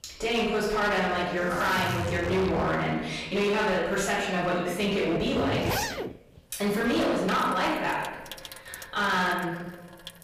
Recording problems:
off-mic speech; far
room echo; noticeable; dies away in 1.1 s
distortion; slight; 13% of the sound clipped
household noises; loud; throughout; 9 dB below the speech

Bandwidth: 15 kHz